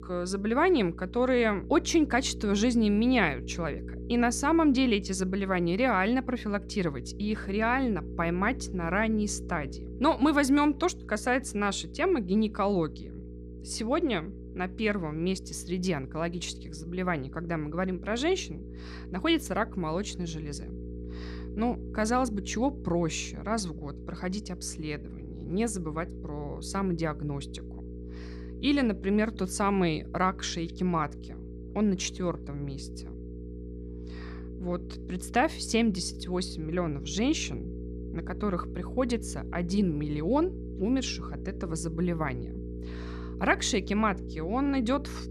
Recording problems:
electrical hum; noticeable; throughout; 60 Hz, 15 dB below the speech

